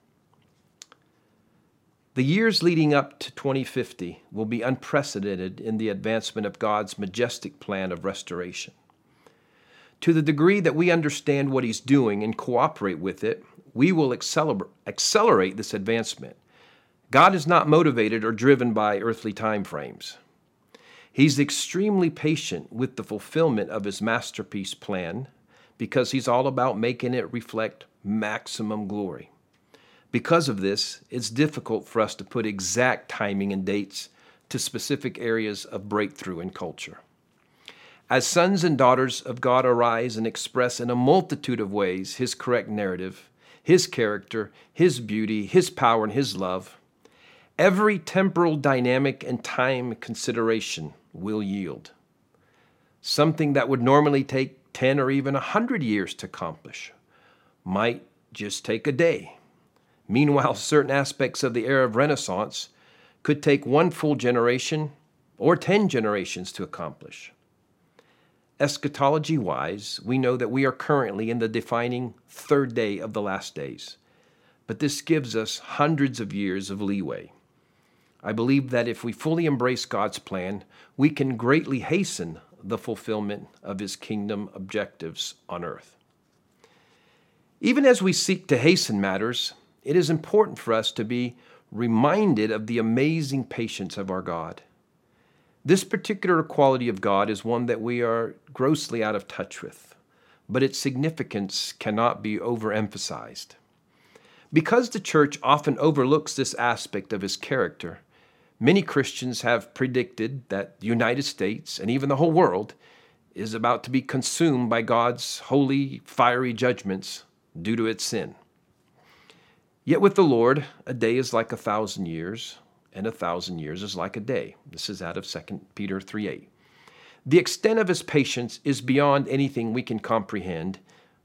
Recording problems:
none

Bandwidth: 16.5 kHz